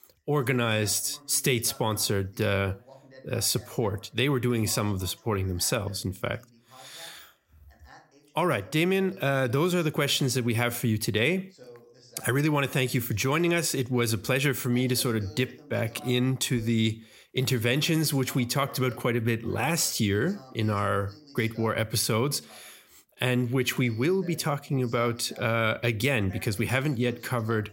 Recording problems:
voice in the background; faint; throughout; 25 dB below the speech

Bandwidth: 16 kHz